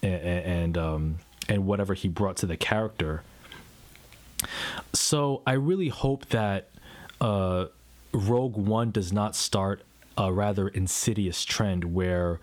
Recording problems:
squashed, flat; somewhat

